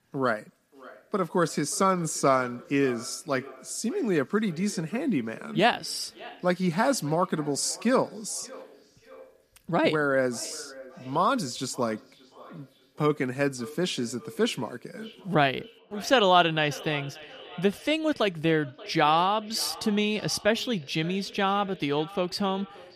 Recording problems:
echo of what is said; faint; throughout; 580 ms later, 20 dB below the speech

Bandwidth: 14.5 kHz